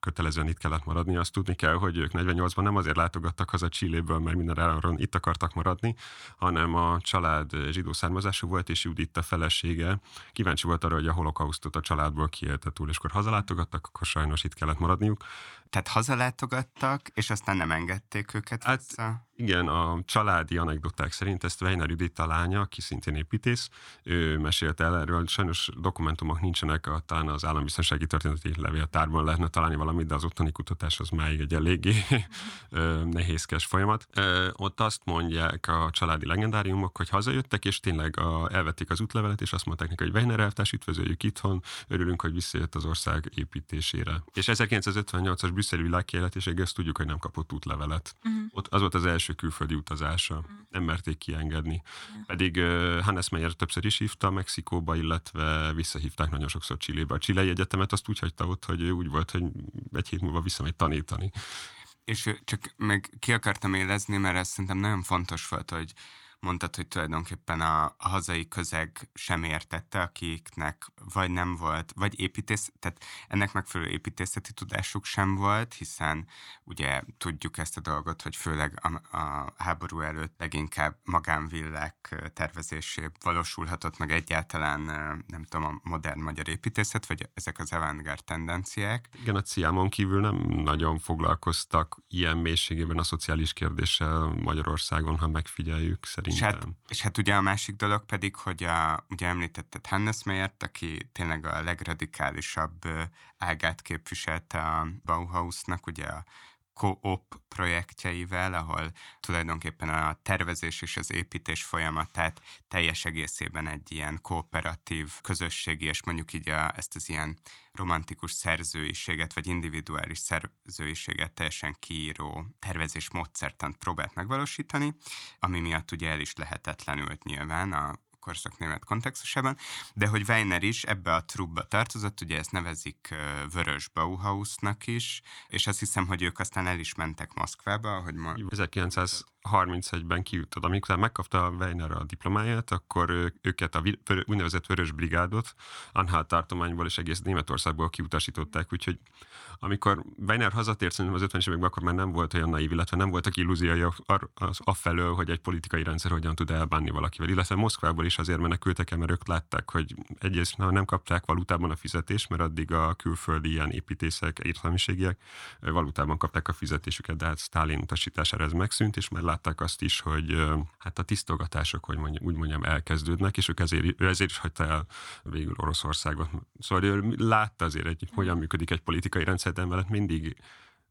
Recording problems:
none

